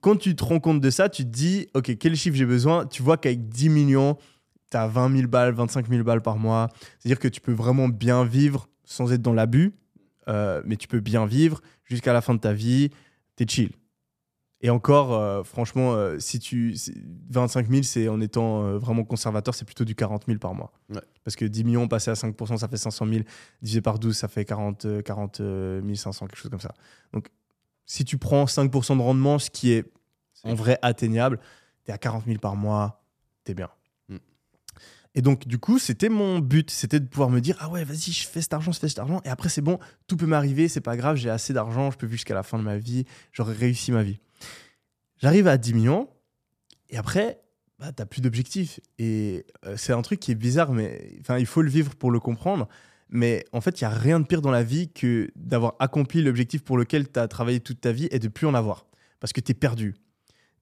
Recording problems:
none

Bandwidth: 14.5 kHz